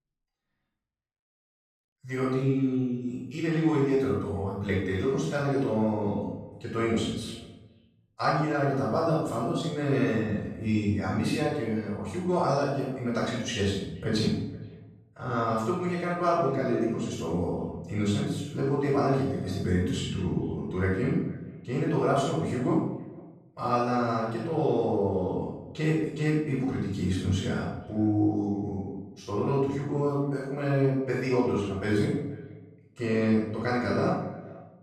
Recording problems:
room echo; strong; dies away in 0.7 s
off-mic speech; far
echo of what is said; faint; throughout; 470 ms later, 25 dB below the speech

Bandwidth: 14.5 kHz